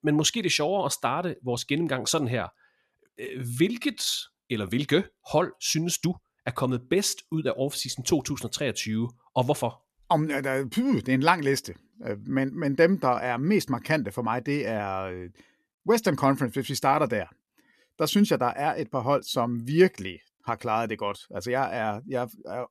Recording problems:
uneven, jittery; slightly; from 3 to 13 s

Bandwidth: 13.5 kHz